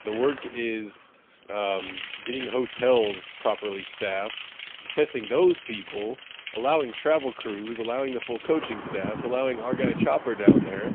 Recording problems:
phone-call audio; poor line; nothing above 3.5 kHz
traffic noise; loud; throughout; 4 dB below the speech

